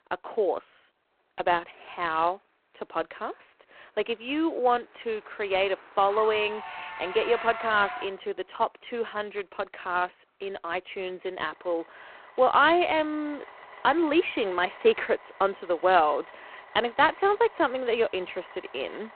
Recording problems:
phone-call audio; poor line
traffic noise; noticeable; throughout; 15 dB below the speech

